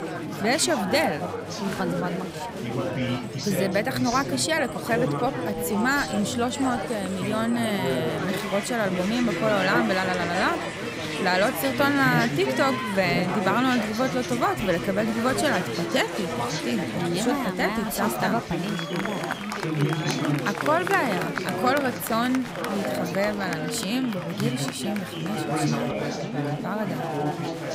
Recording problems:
chatter from many people; loud; throughout; 3 dB below the speech

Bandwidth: 15.5 kHz